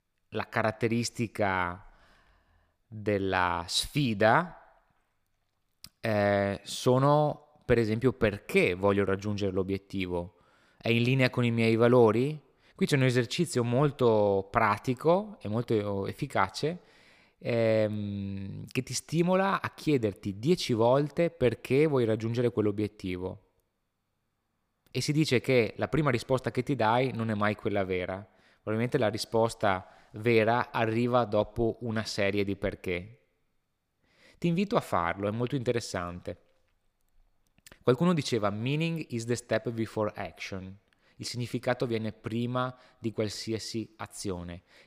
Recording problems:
none

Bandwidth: 15 kHz